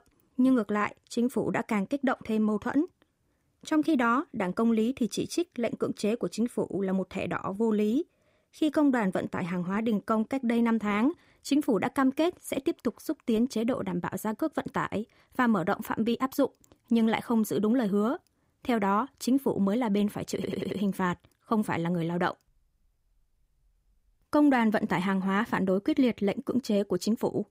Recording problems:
audio stuttering; at 20 s

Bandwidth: 15.5 kHz